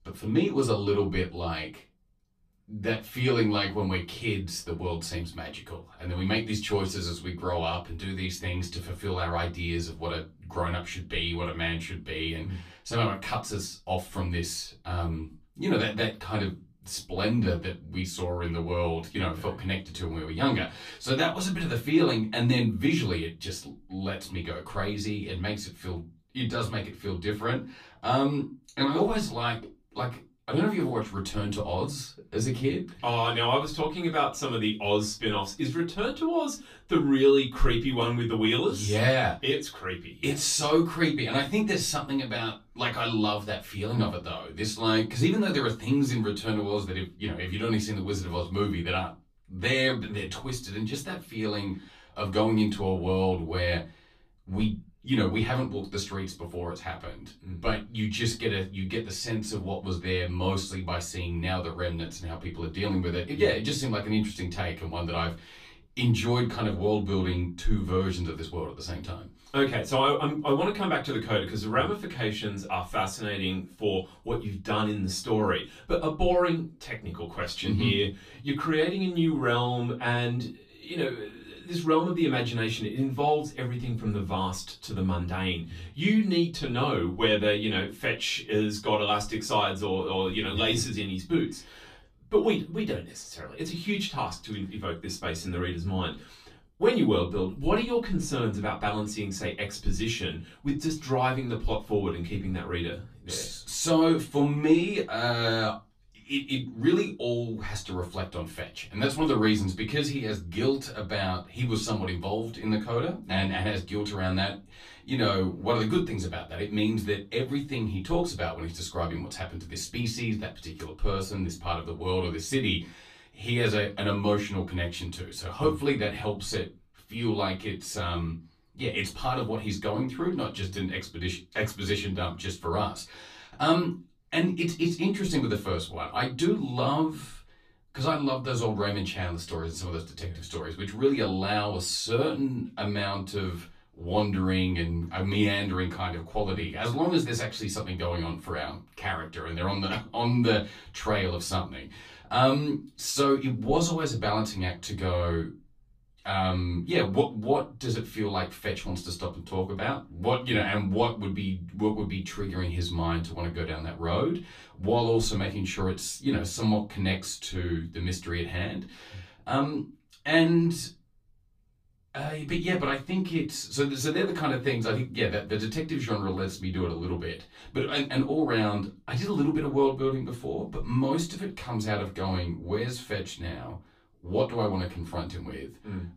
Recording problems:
off-mic speech; far
room echo; very slight; dies away in 0.2 s

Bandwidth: 15 kHz